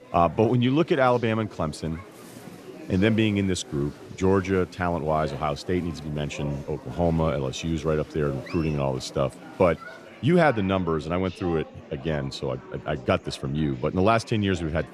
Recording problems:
murmuring crowd; noticeable; throughout; 15 dB below the speech

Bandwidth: 14.5 kHz